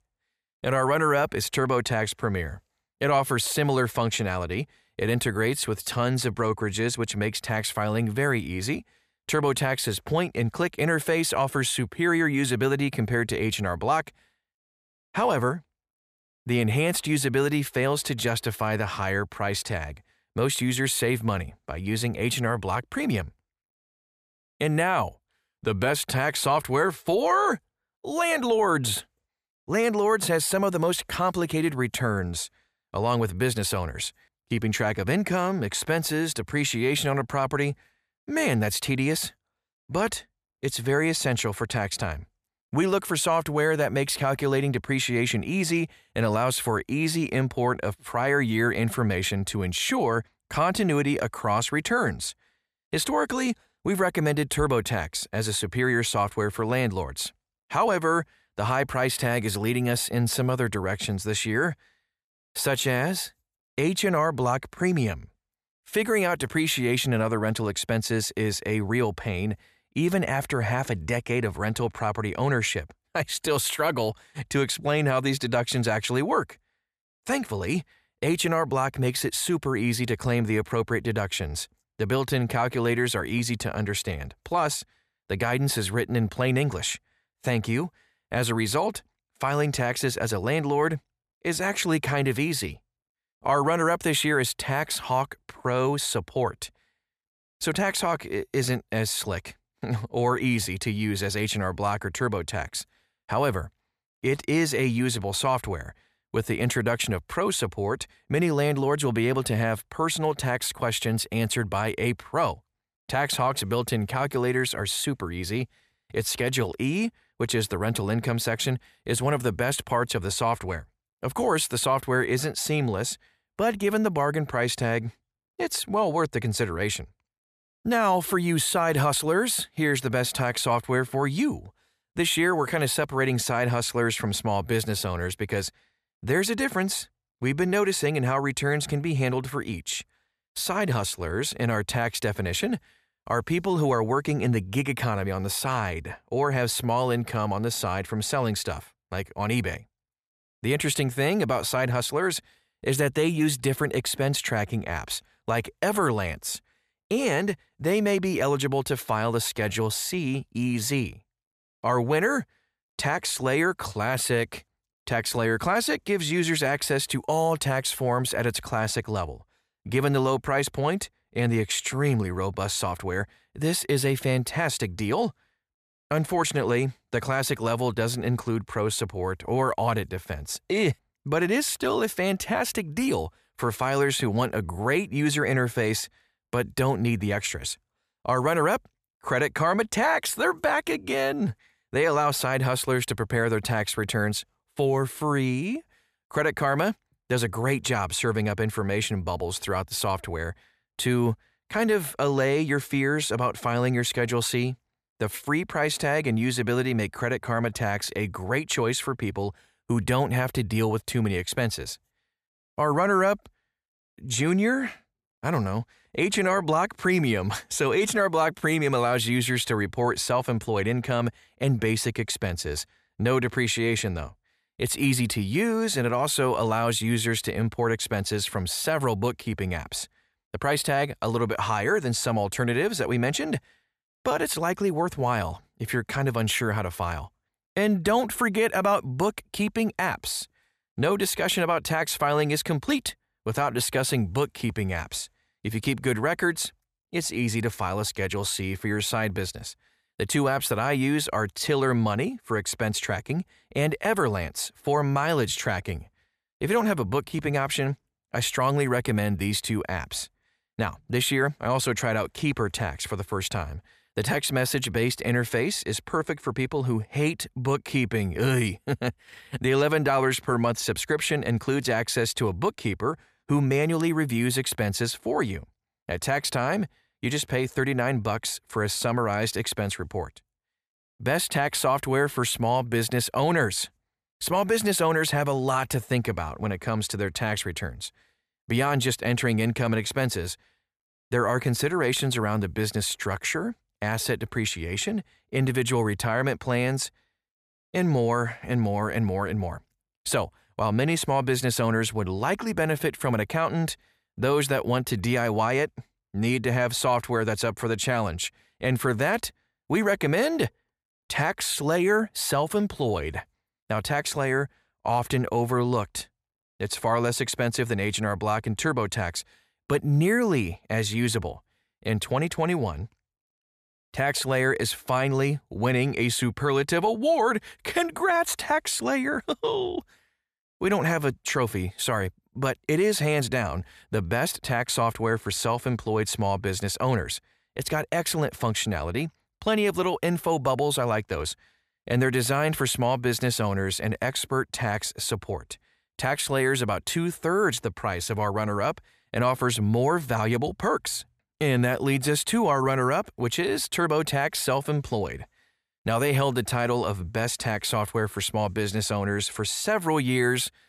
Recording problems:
none

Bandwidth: 14.5 kHz